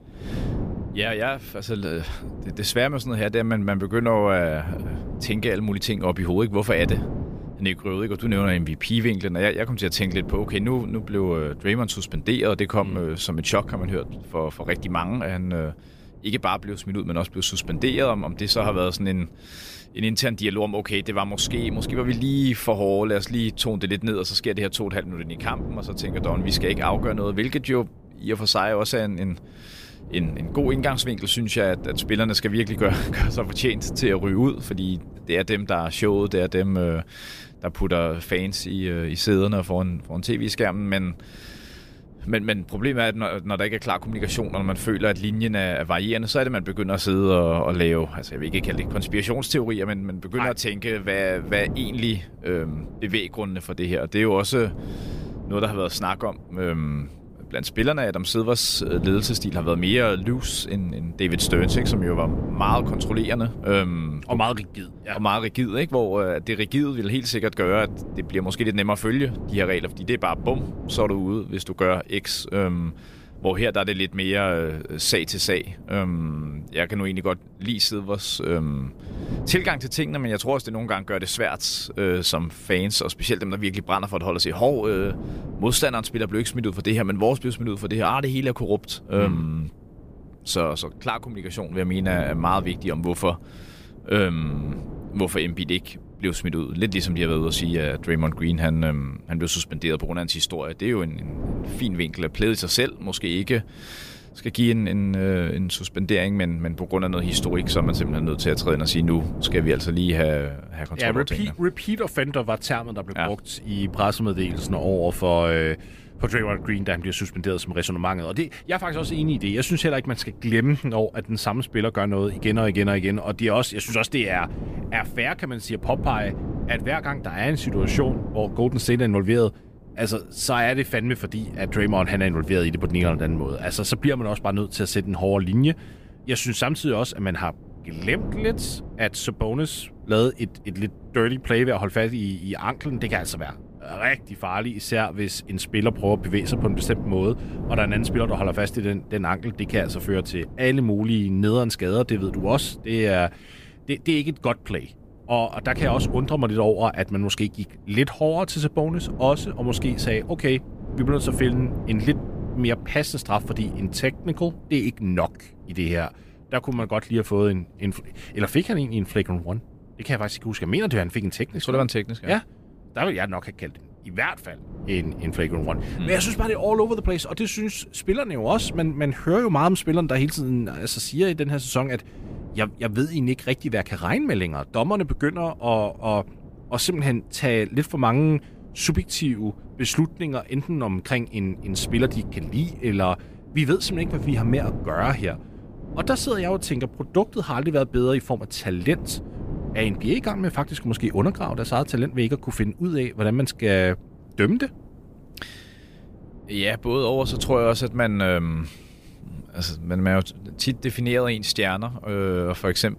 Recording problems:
wind noise on the microphone; occasional gusts; 15 dB below the speech

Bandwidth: 15 kHz